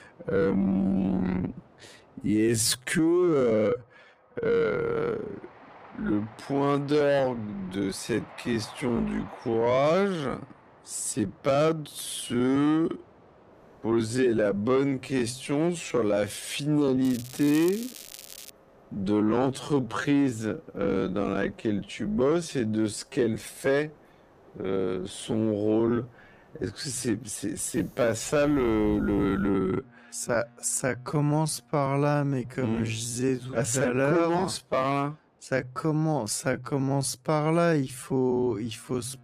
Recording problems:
wrong speed, natural pitch; too slow; 0.5 times normal speed
crackling; noticeable; from 17 to 19 s; 15 dB below the speech
train or aircraft noise; faint; throughout; 25 dB below the speech

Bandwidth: 15 kHz